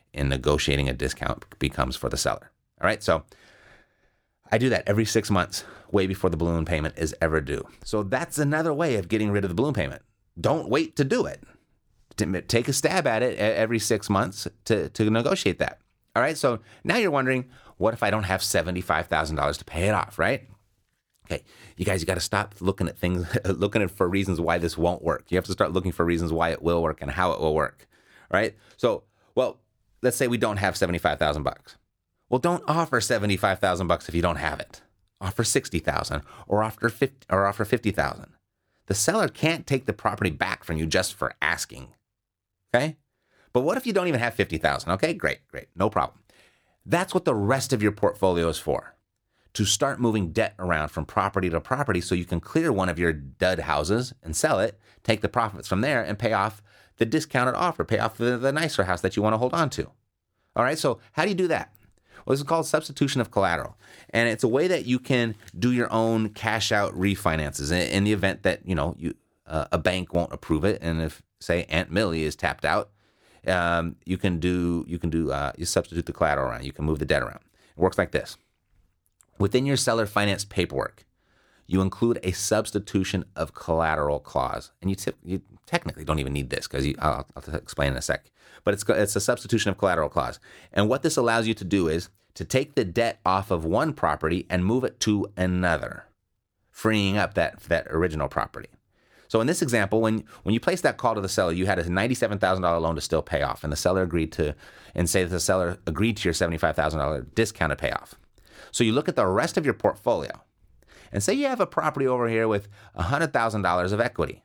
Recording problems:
none

